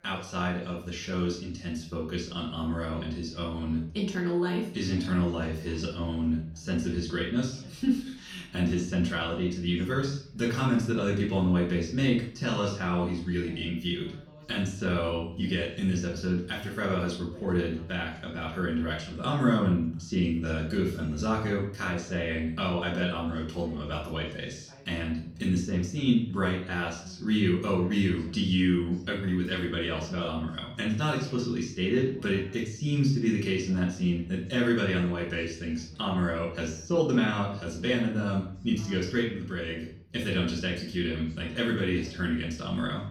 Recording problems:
off-mic speech; far
room echo; slight; dies away in 0.5 s
background chatter; faint; throughout; 2 voices, 25 dB below the speech

